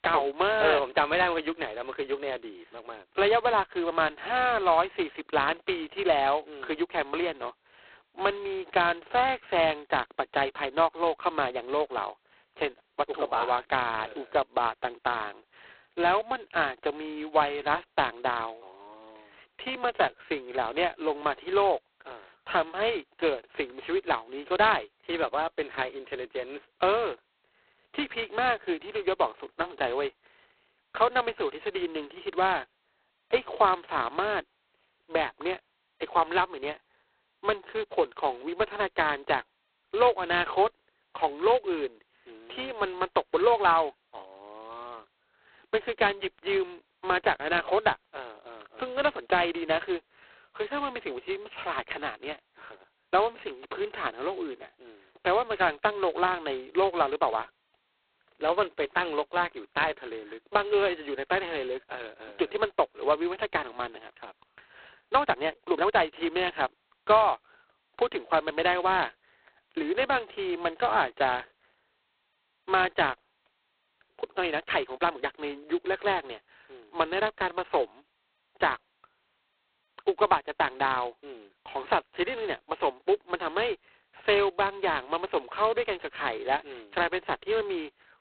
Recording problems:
phone-call audio; poor line; nothing above 4 kHz
uneven, jittery; strongly; from 20 s to 1:15

